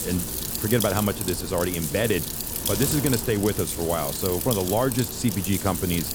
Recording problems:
wind noise on the microphone; heavy; 5 dB below the speech

